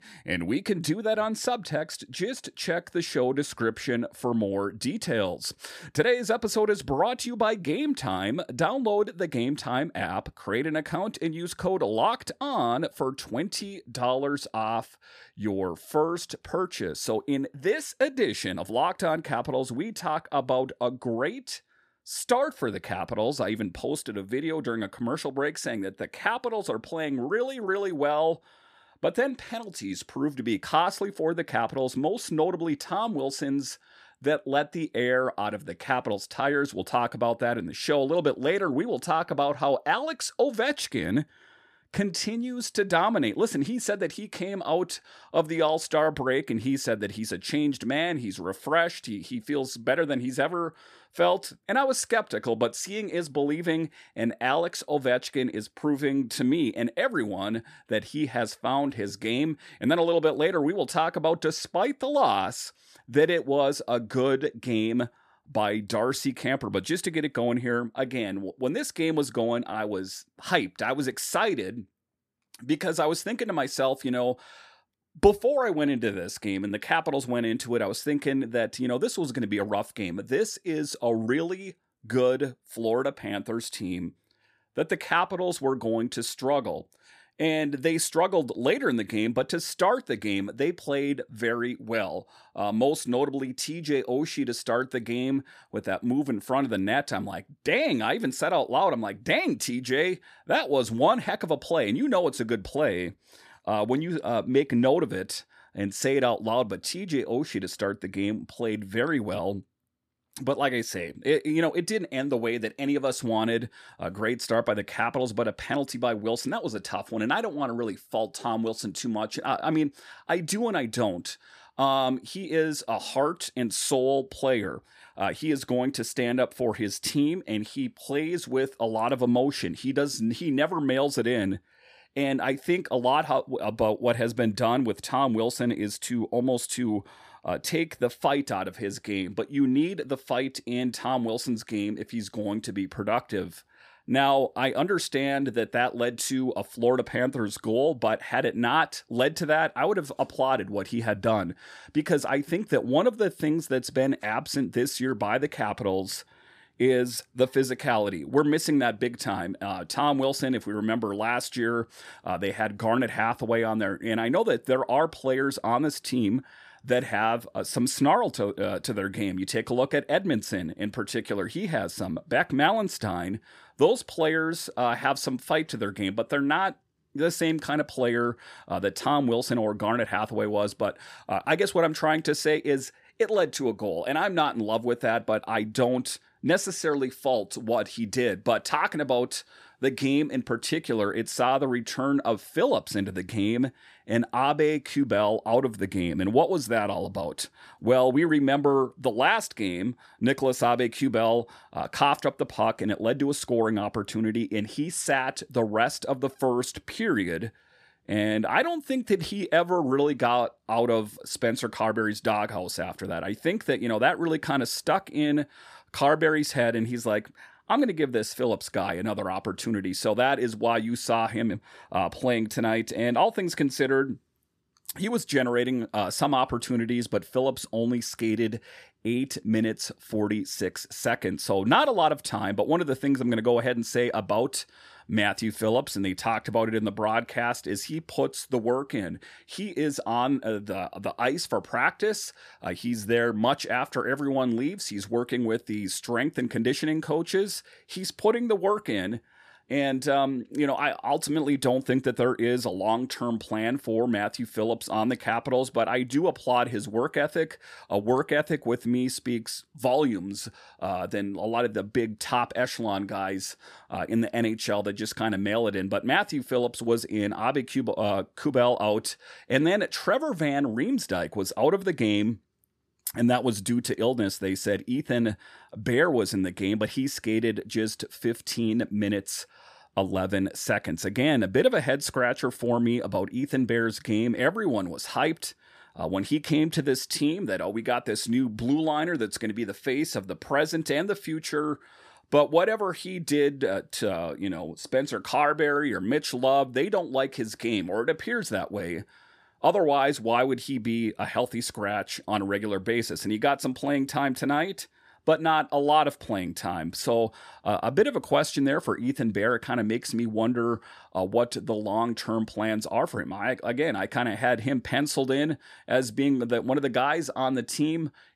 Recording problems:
none

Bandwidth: 14.5 kHz